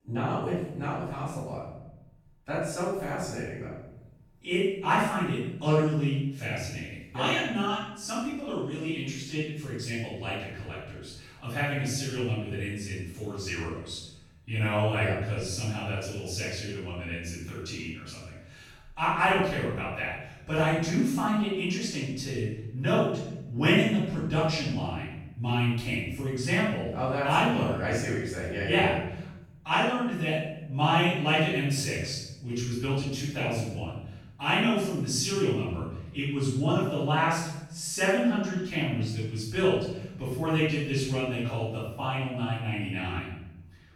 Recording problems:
room echo; strong; dies away in 0.9 s
off-mic speech; far

